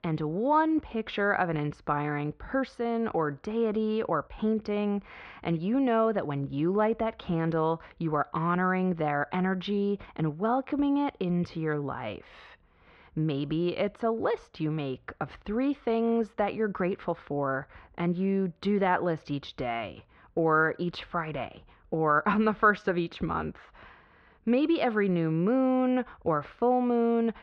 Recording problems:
muffled; slightly; fading above 3.5 kHz

